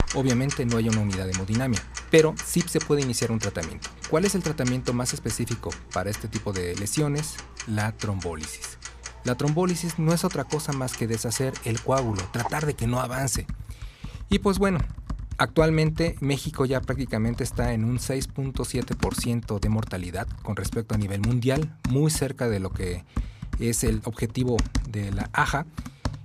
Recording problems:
household noises; loud; throughout; 9 dB below the speech

